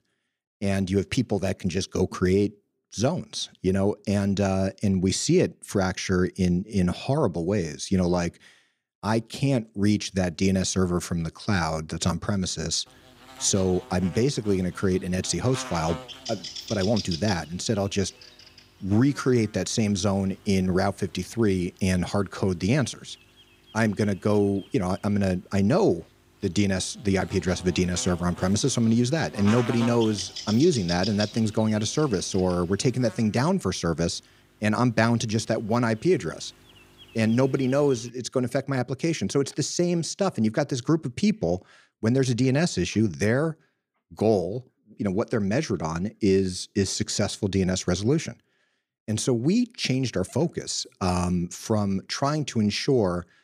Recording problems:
electrical hum; noticeable; from 13 to 38 s; 50 Hz, 10 dB below the speech

